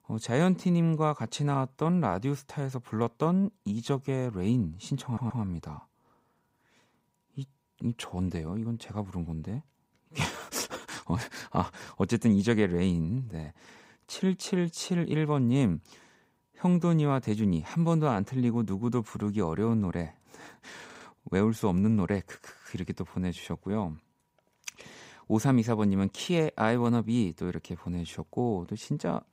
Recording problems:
audio stuttering; at 5 s and at 21 s

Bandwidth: 15.5 kHz